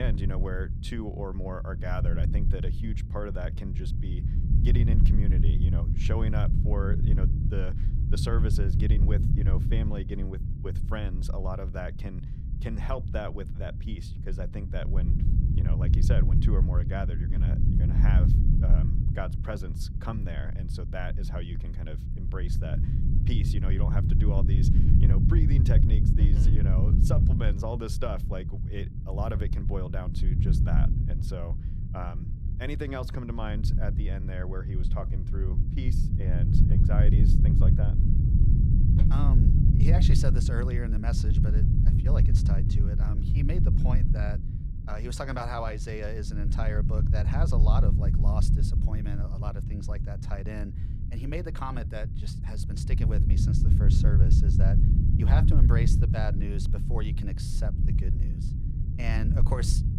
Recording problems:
low rumble; loud; throughout; 1 dB below the speech
abrupt cut into speech; at the start

